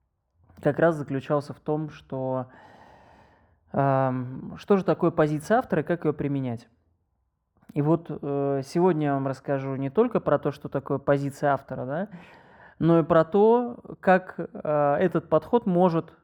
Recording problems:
muffled; very; fading above 2 kHz

